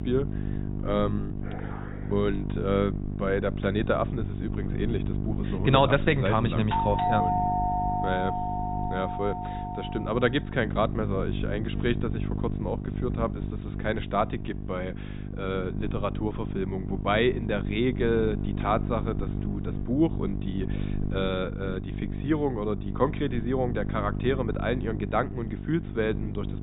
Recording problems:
high frequencies cut off; severe; nothing above 4 kHz
electrical hum; noticeable; throughout; 50 Hz, 10 dB below the speech
dog barking; faint; at 1.5 s; peak 10 dB below the speech
doorbell; loud; from 6.5 to 10 s; peak 4 dB above the speech

